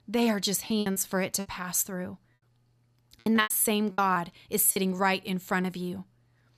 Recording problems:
choppy; very; at 0.5 s, at 3 s and at 4.5 s; 13% of the speech affected

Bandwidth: 14.5 kHz